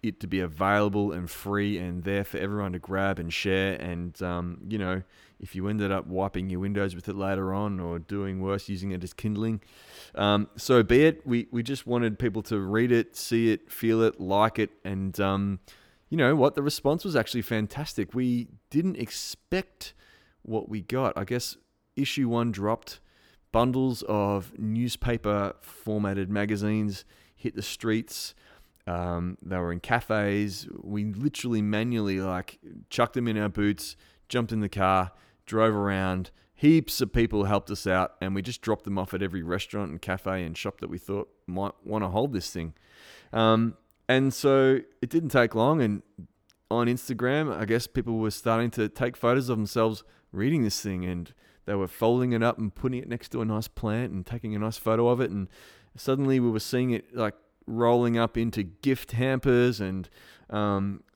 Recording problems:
none

